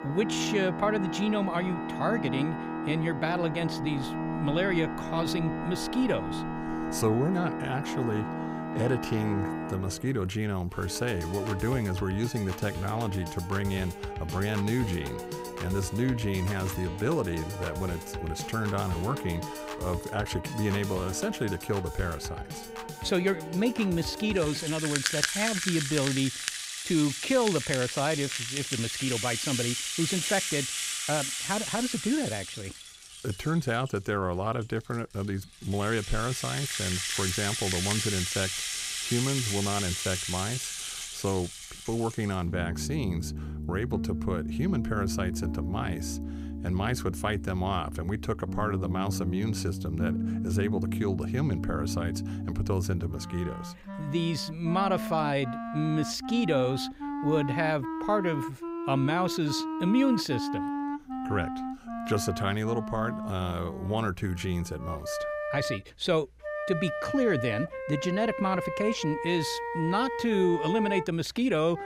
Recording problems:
background music; loud; throughout; 3 dB below the speech

